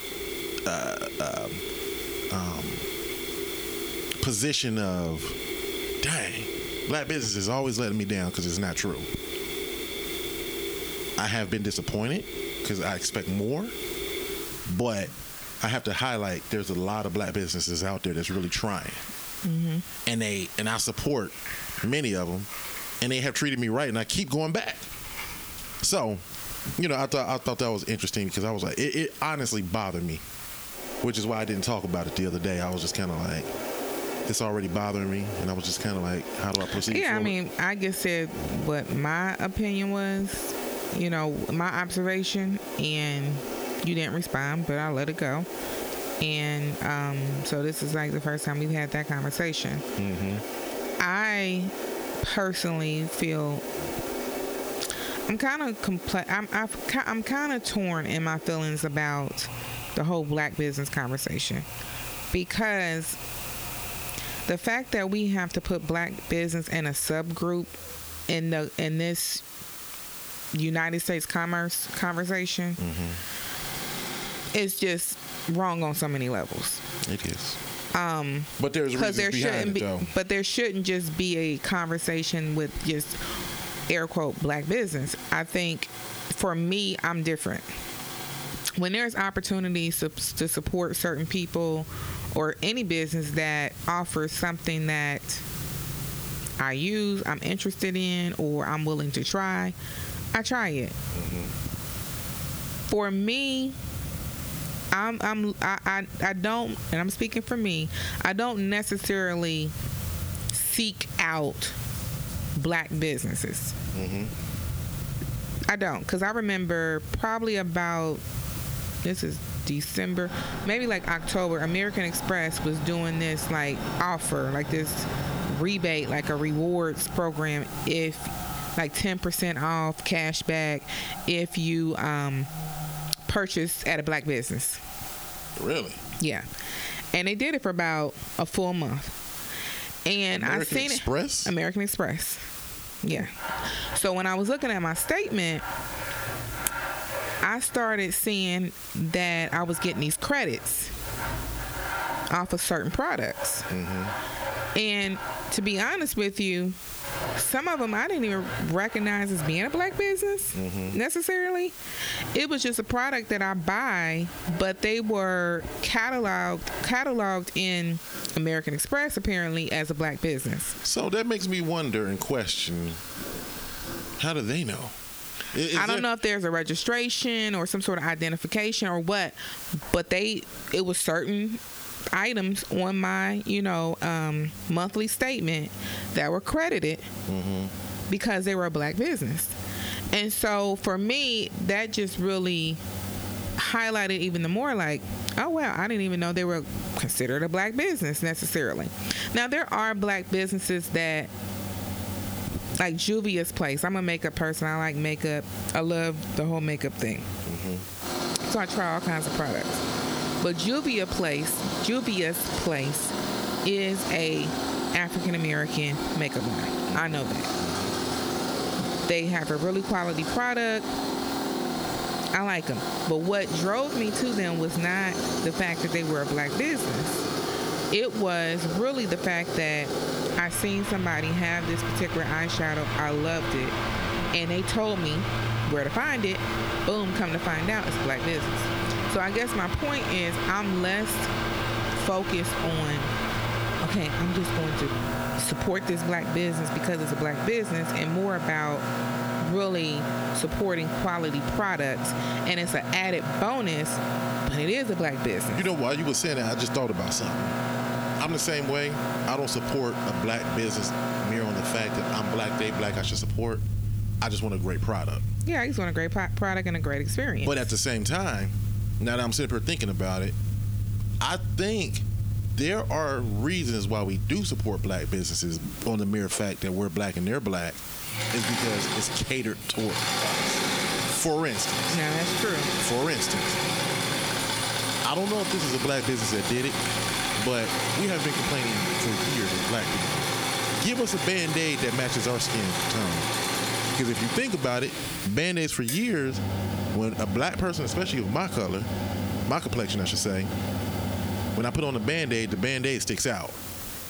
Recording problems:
squashed, flat; heavily, background pumping
machinery noise; loud; throughout; 5 dB below the speech
hiss; noticeable; throughout; 15 dB below the speech

